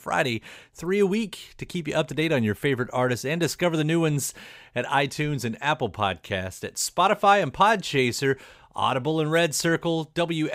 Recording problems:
abrupt cut into speech; at the end

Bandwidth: 15.5 kHz